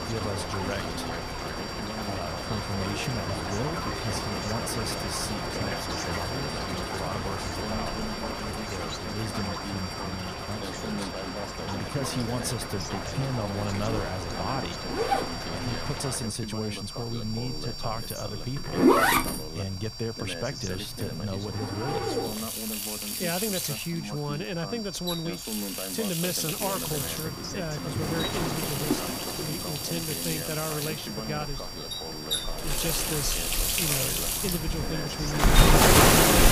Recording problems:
rain or running water; very loud; throughout; 4 dB above the speech
household noises; very loud; from 12 s on; 5 dB above the speech
high-pitched whine; loud; throughout; 4.5 kHz, 5 dB below the speech
voice in the background; loud; throughout; 6 dB below the speech

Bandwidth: 15 kHz